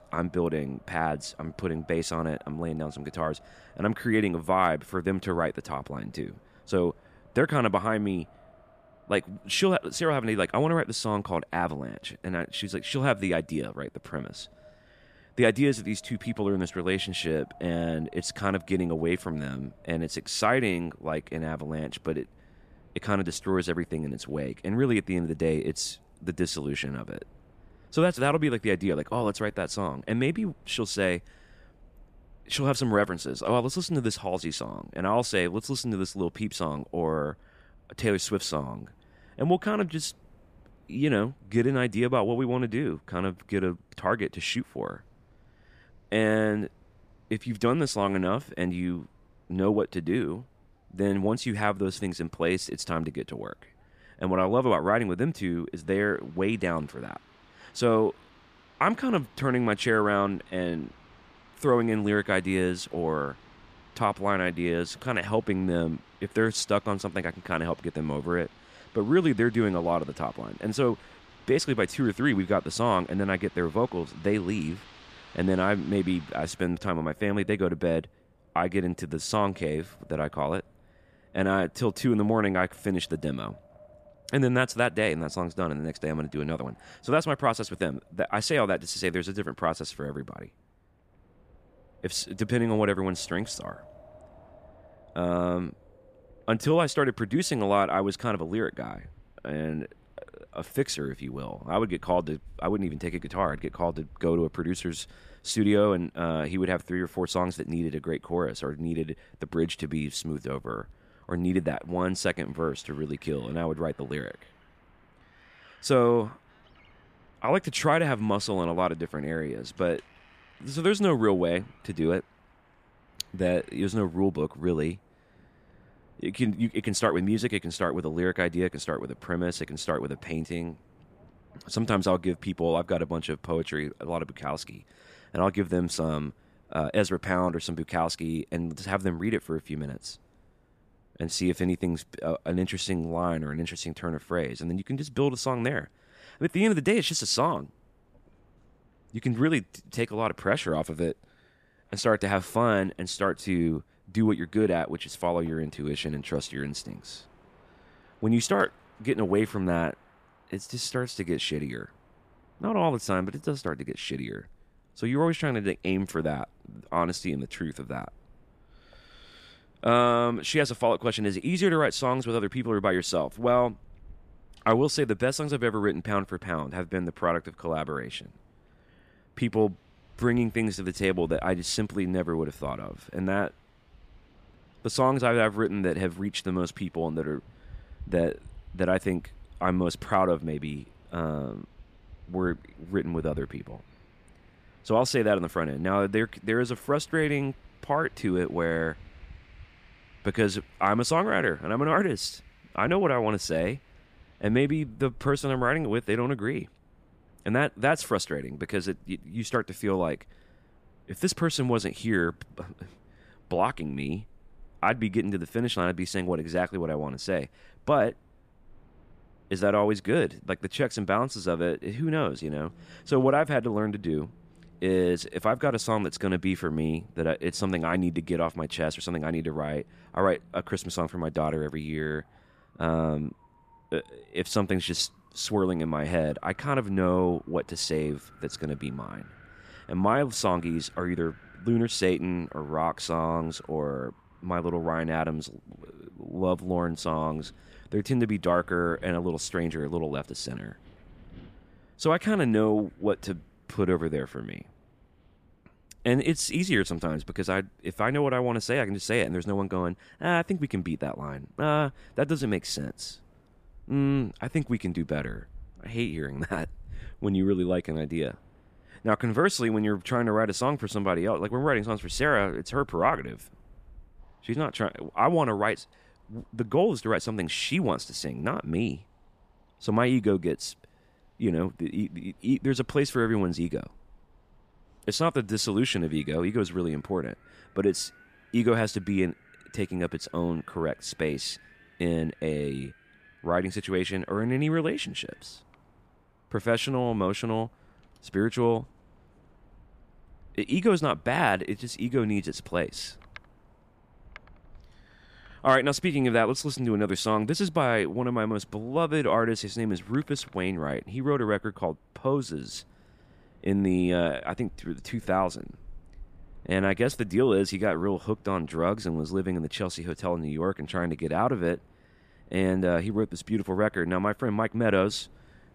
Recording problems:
wind in the background; faint; throughout; 30 dB below the speech

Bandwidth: 14.5 kHz